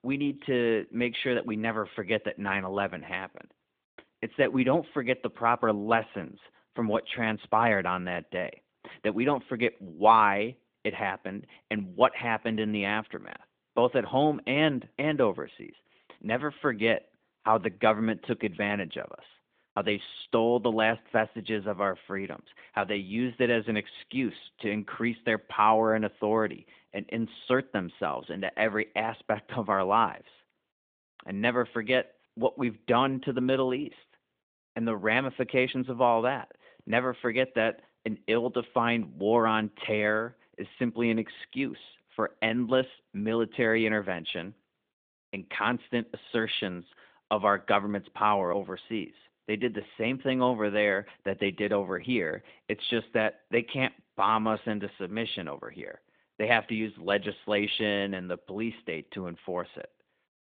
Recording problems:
phone-call audio

